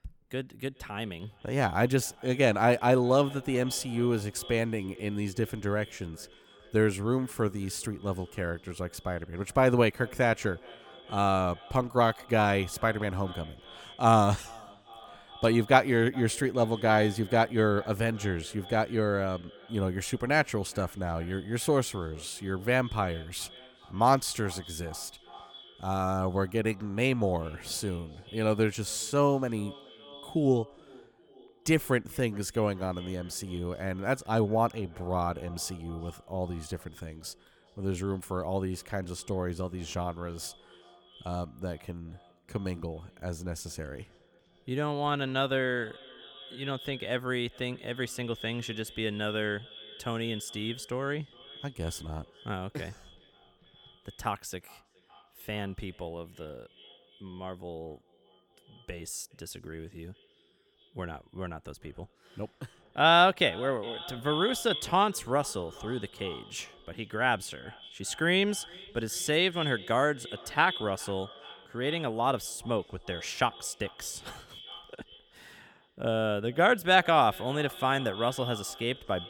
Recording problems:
echo of what is said; noticeable; throughout; 410 ms later, 15 dB below the speech

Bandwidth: 18 kHz